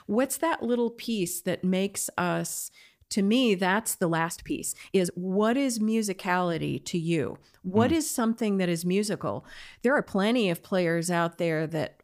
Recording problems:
uneven, jittery; strongly; from 2 to 11 s

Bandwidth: 15 kHz